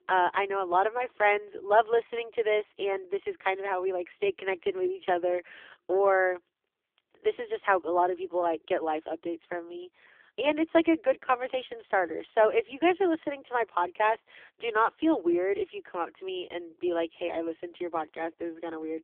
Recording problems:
phone-call audio; poor line; nothing above 3.5 kHz

